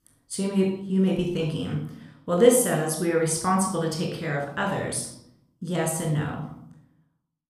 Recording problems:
room echo; noticeable; dies away in 0.6 s
off-mic speech; somewhat distant

